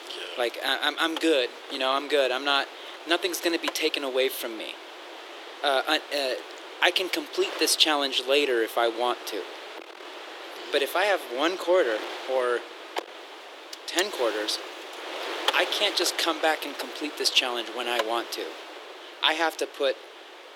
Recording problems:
thin; very; fading below 350 Hz
wind noise on the microphone; occasional gusts; 10 dB below the speech

